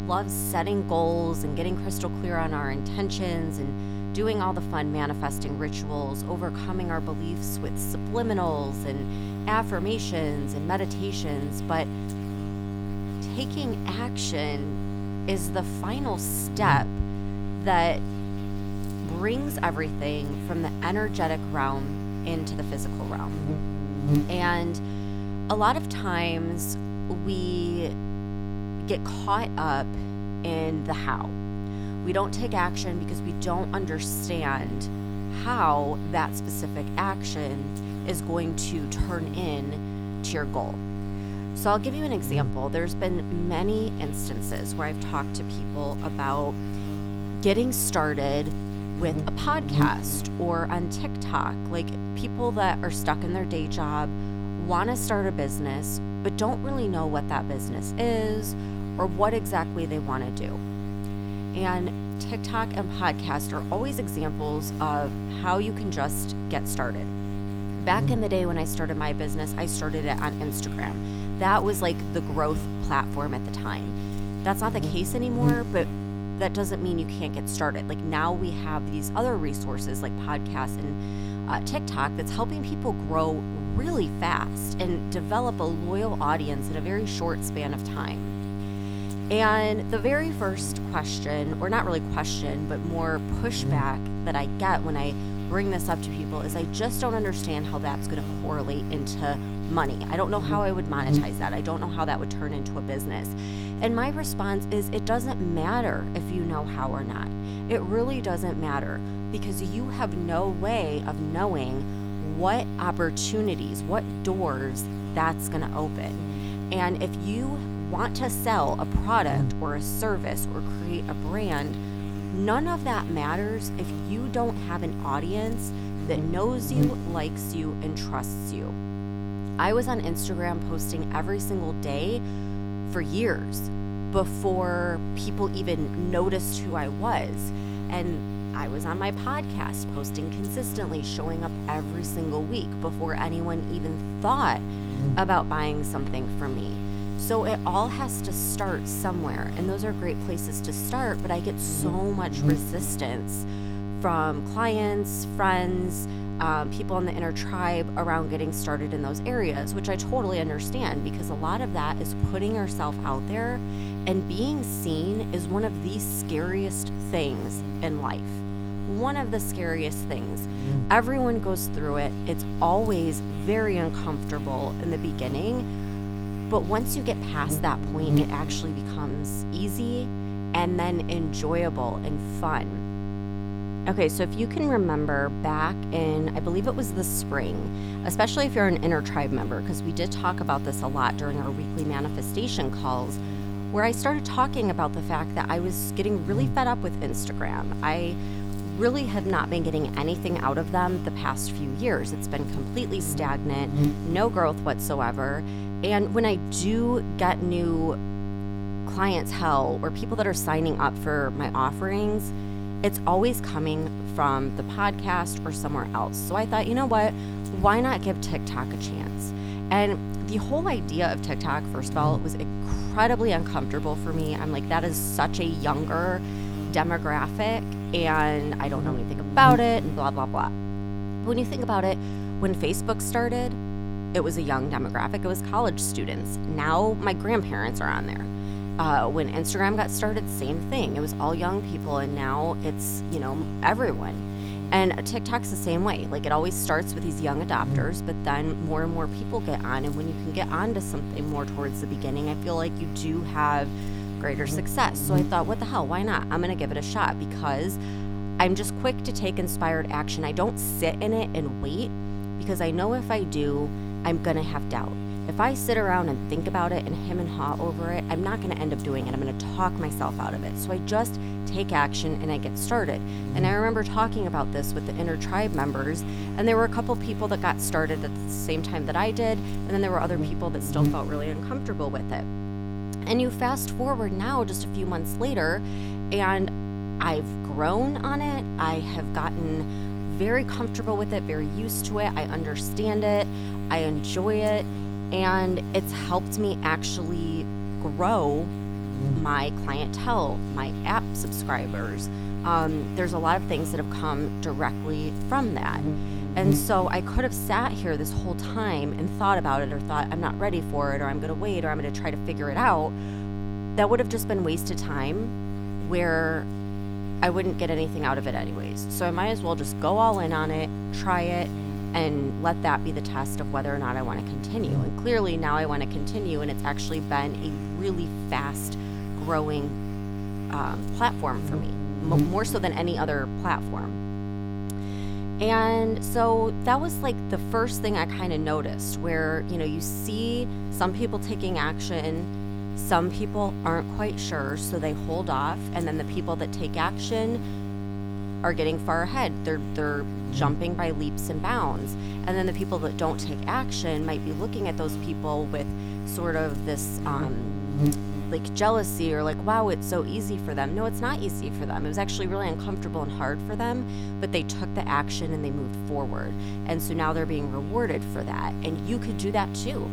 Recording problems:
electrical hum; loud; throughout; 50 Hz, 10 dB below the speech

